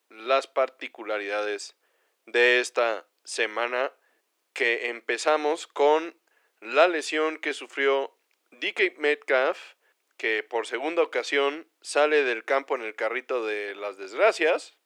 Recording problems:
thin; somewhat; fading below 350 Hz

